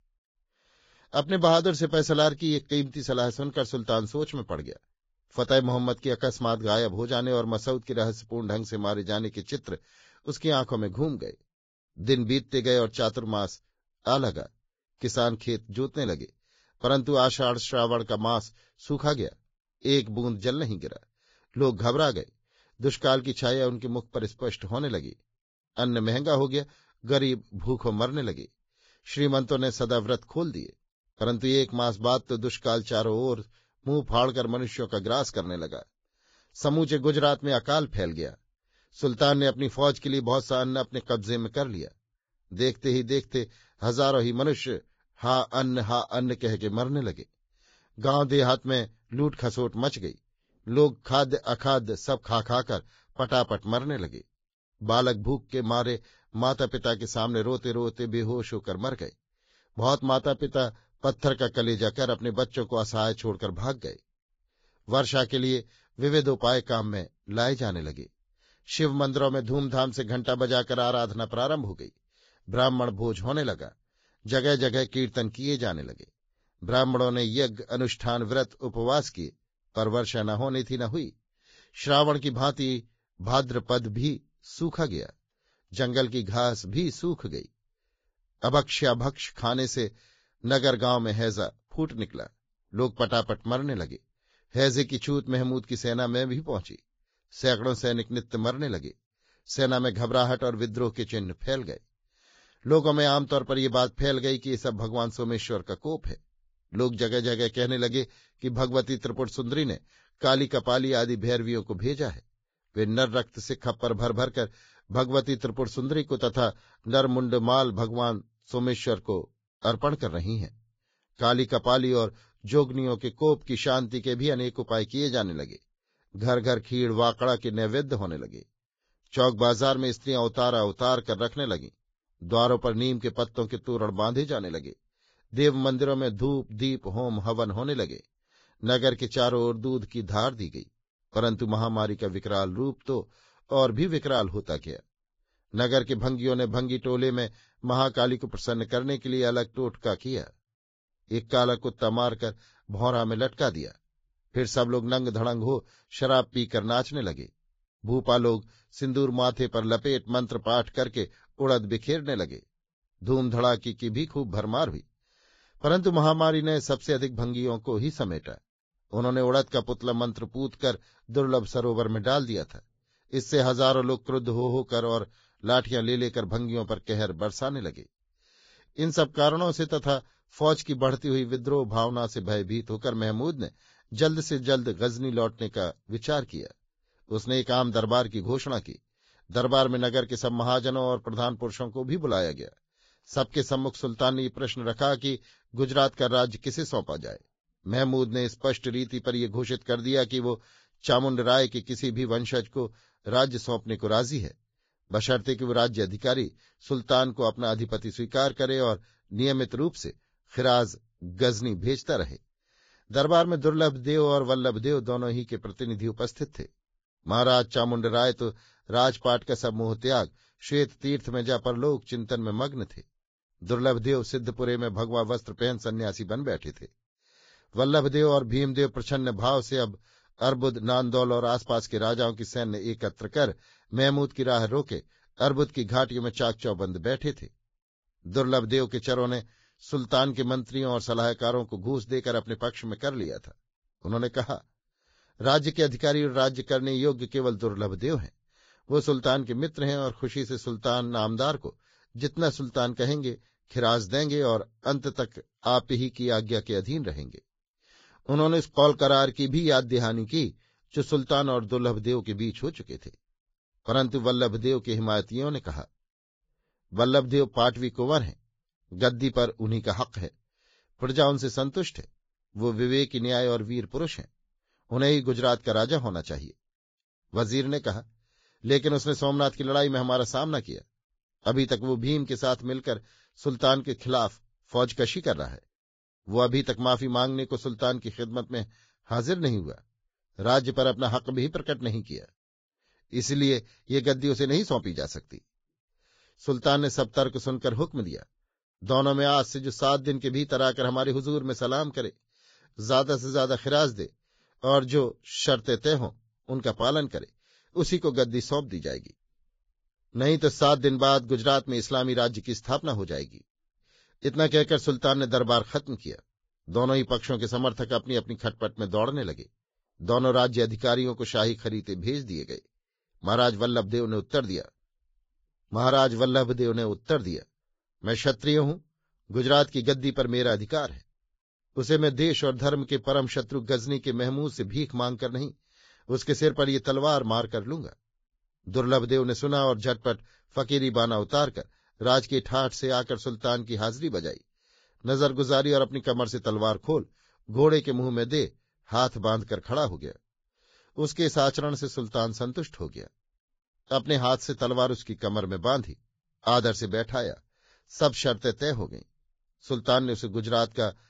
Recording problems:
garbled, watery; badly; nothing above 7.5 kHz

